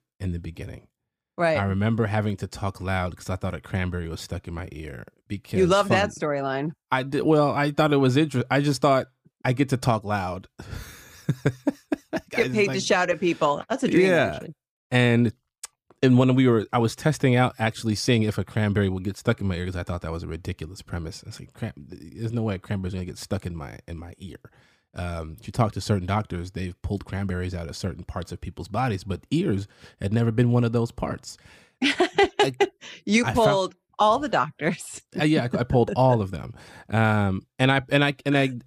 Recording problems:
none

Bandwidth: 15 kHz